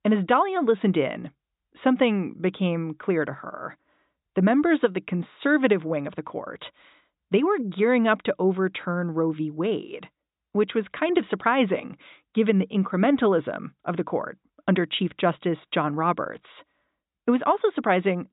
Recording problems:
high frequencies cut off; severe; nothing above 4 kHz

